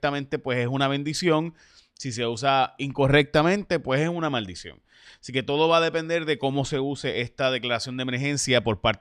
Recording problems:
none

